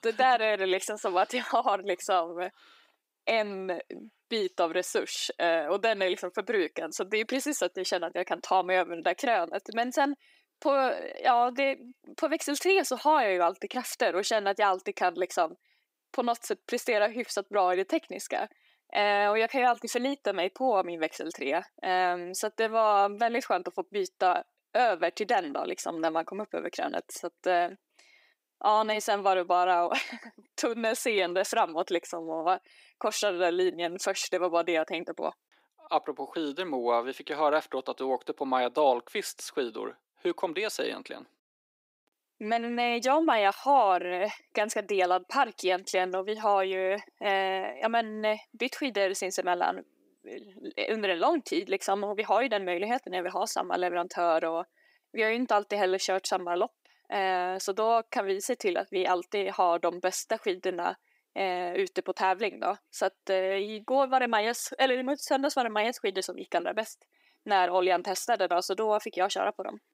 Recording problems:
thin; somewhat; fading below 350 Hz

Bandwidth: 15.5 kHz